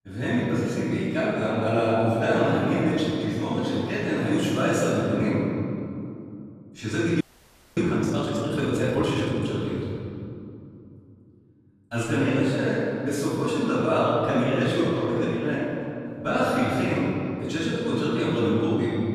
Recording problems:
room echo; strong; dies away in 2.7 s
off-mic speech; far
audio freezing; at 7 s for 0.5 s

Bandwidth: 14.5 kHz